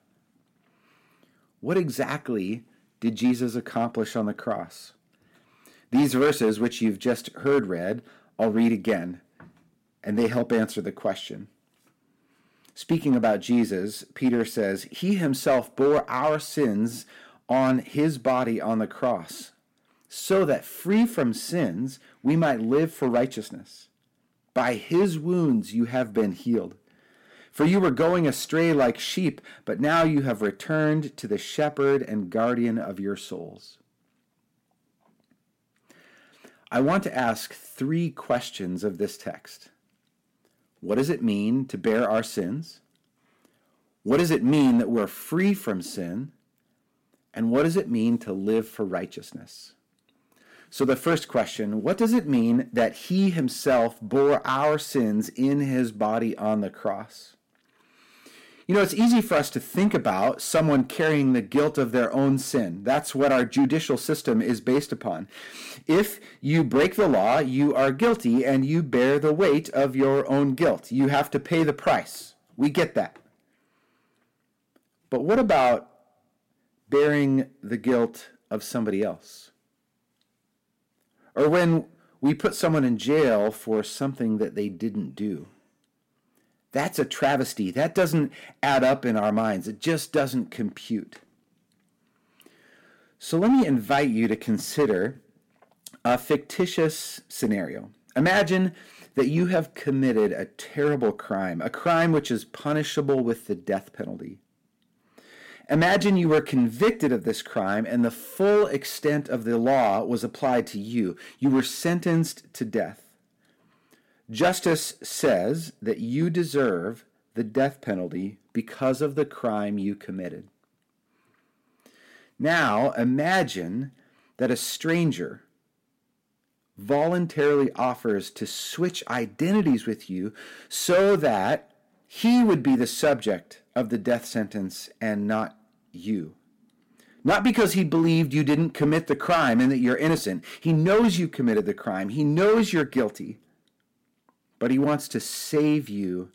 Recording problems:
distortion; slight; 4% of the sound clipped

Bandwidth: 16.5 kHz